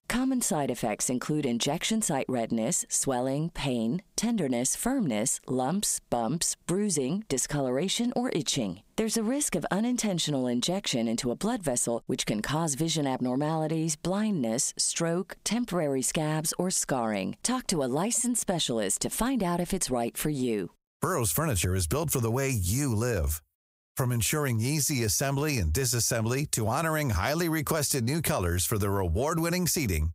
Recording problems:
squashed, flat; somewhat

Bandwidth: 15.5 kHz